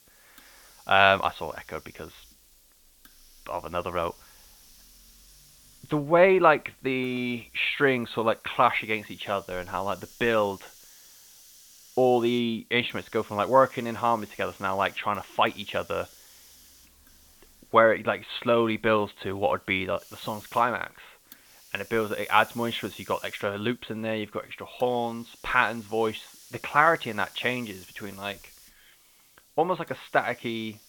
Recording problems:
high frequencies cut off; severe; nothing above 4 kHz
hiss; faint; throughout; 25 dB below the speech

